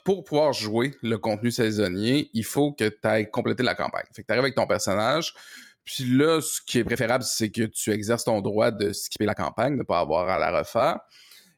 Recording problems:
uneven, jittery; strongly; from 1 to 11 s

